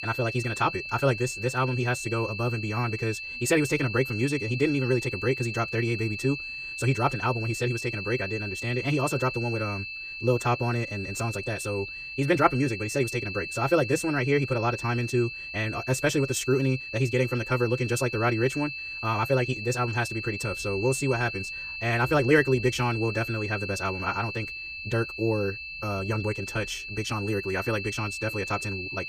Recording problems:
wrong speed, natural pitch; too fast; 1.5 times normal speed
high-pitched whine; loud; throughout; 2.5 kHz, 7 dB below the speech

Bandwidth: 15 kHz